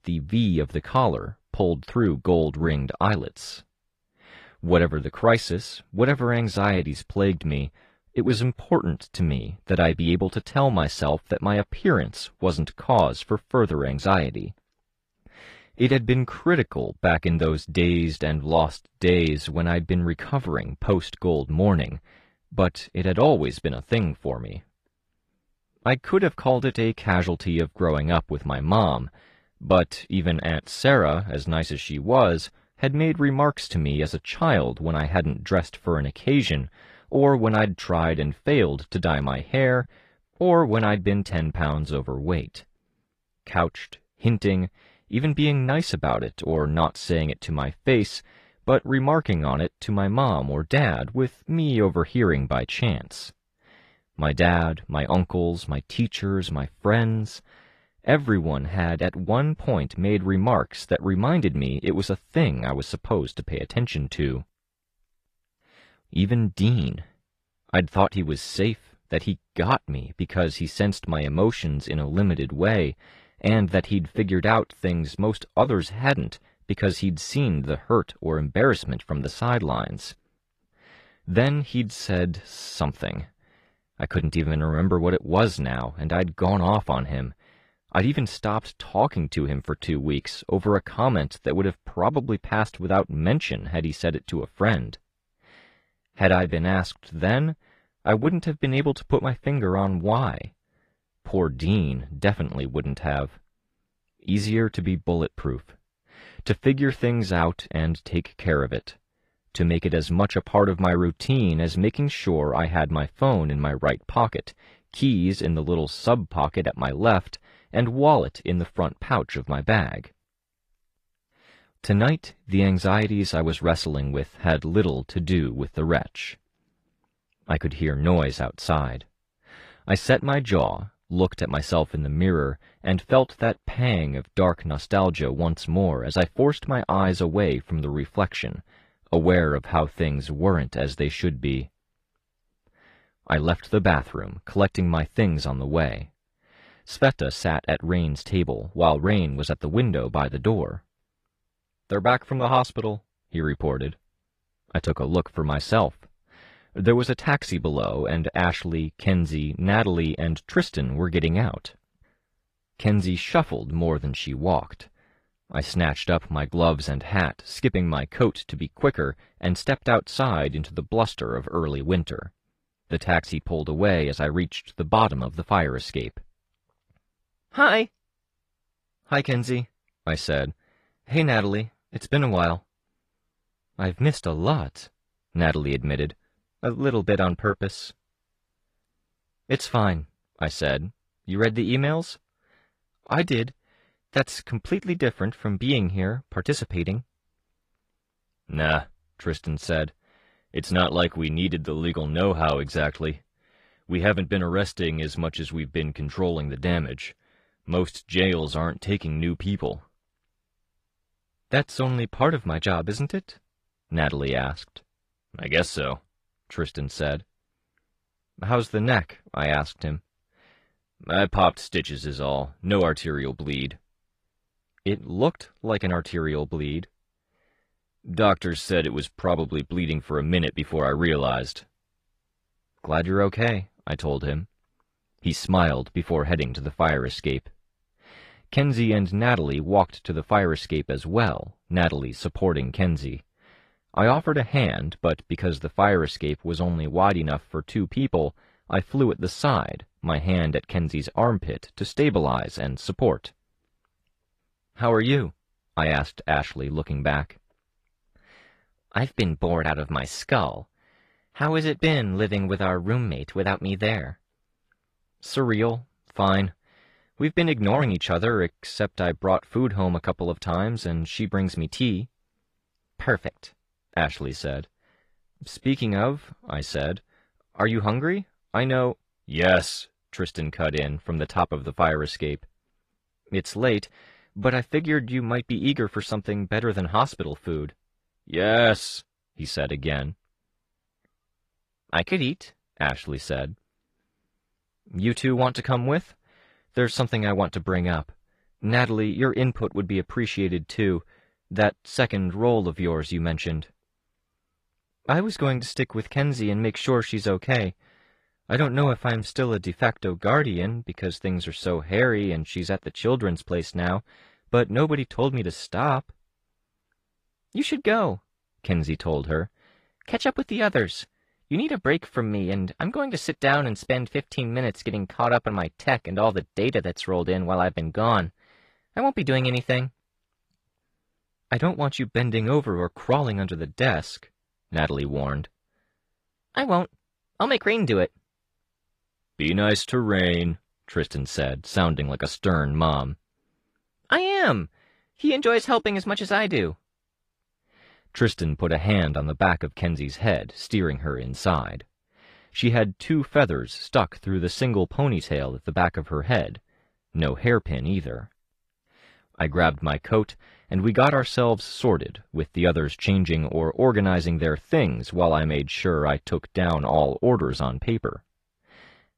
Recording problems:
garbled, watery; slightly; nothing above 14.5 kHz

